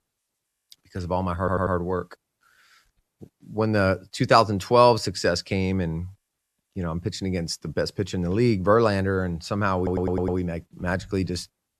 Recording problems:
audio stuttering; at 1.5 s and at 10 s

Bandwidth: 13.5 kHz